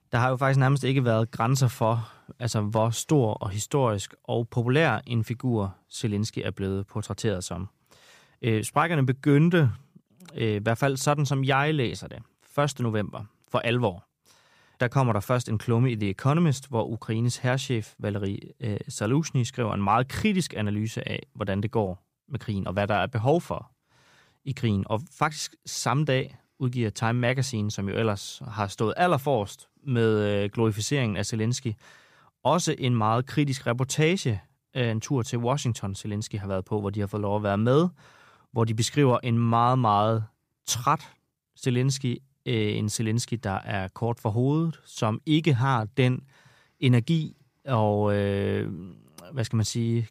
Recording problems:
none

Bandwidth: 15 kHz